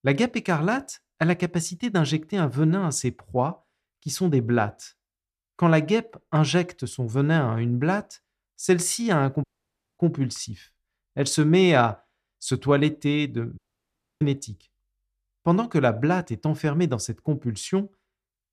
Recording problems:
audio cutting out; at 9.5 s for 0.5 s and at 14 s for 0.5 s

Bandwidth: 14 kHz